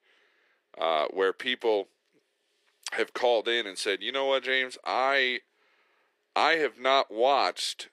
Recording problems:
thin; very; fading below 400 Hz

